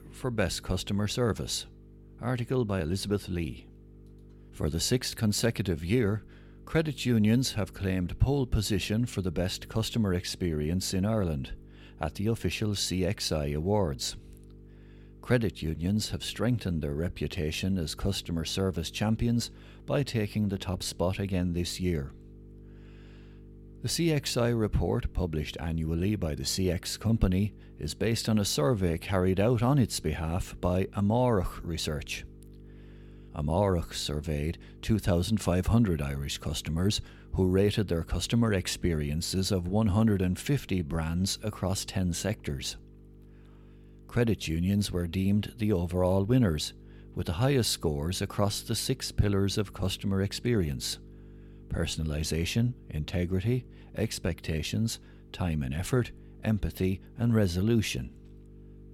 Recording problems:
electrical hum; faint; throughout; 50 Hz, 25 dB below the speech

